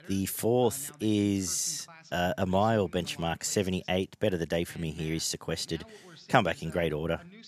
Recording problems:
voice in the background; faint; throughout; 20 dB below the speech

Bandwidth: 14.5 kHz